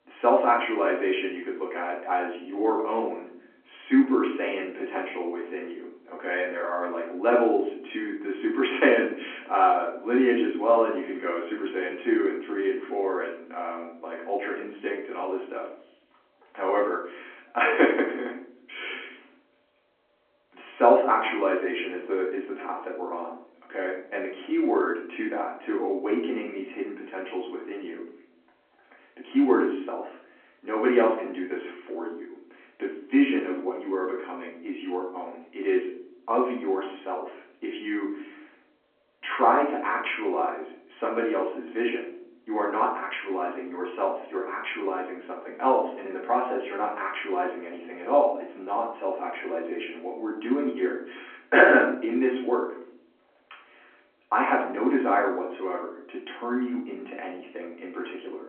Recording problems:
off-mic speech; far
room echo; noticeable; dies away in 0.5 s
phone-call audio

